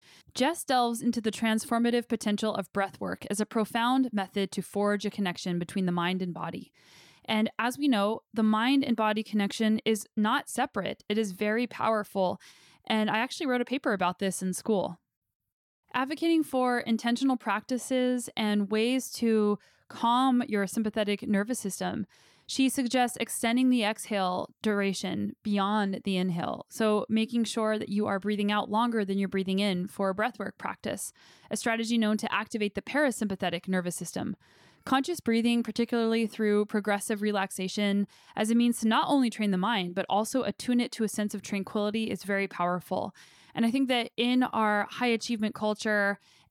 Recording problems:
none

